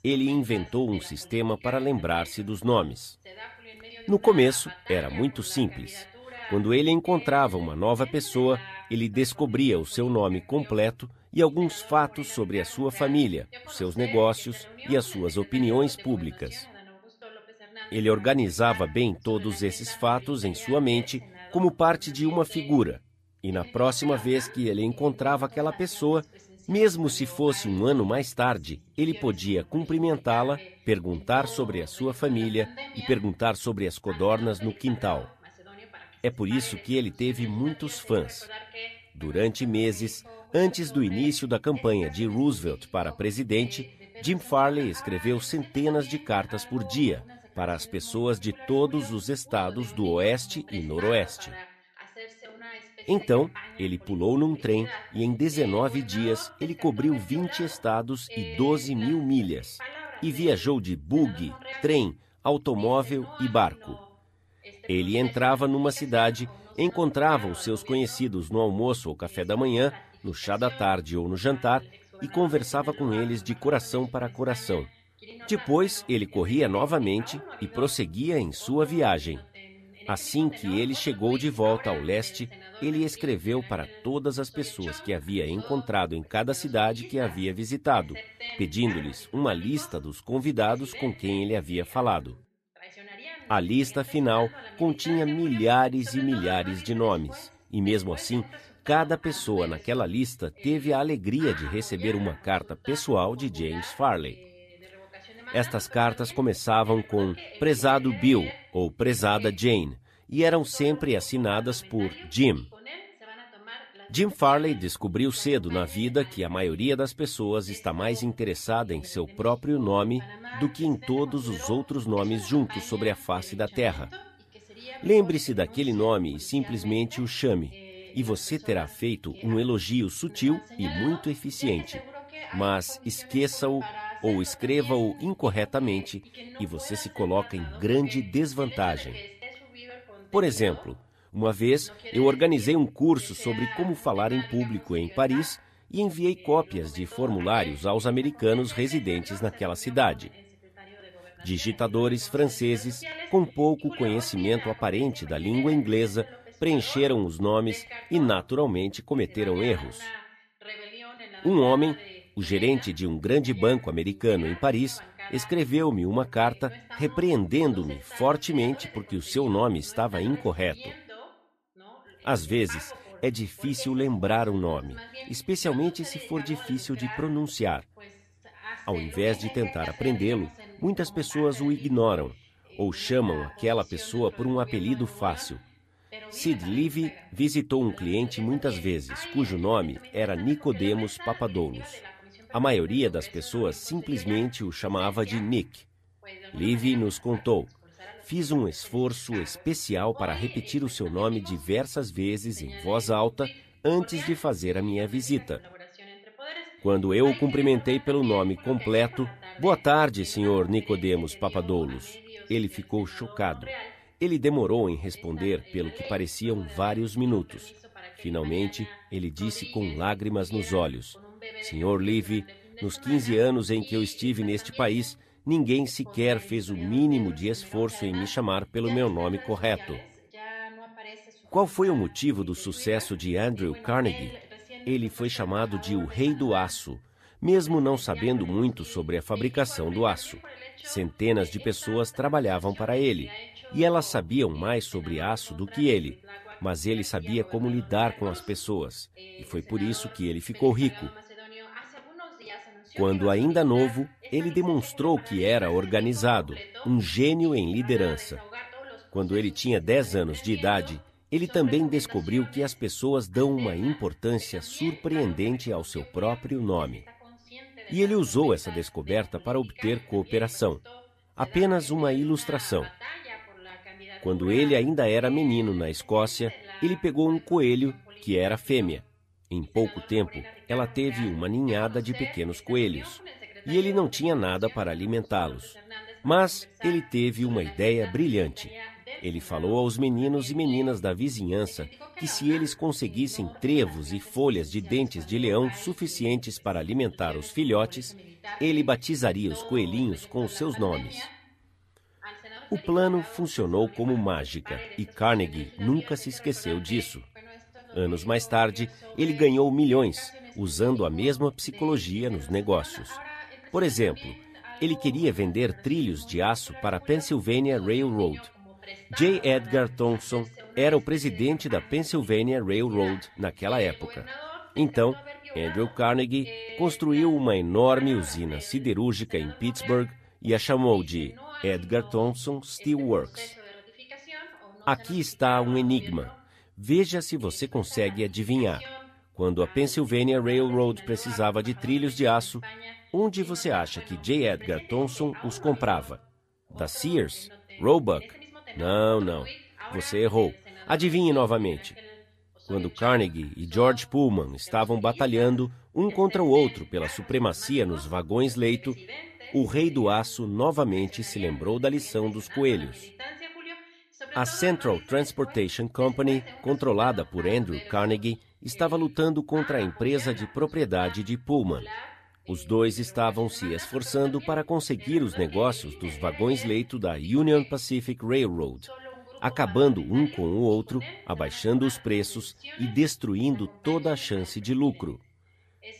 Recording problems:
voice in the background; noticeable; throughout; 15 dB below the speech

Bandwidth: 14.5 kHz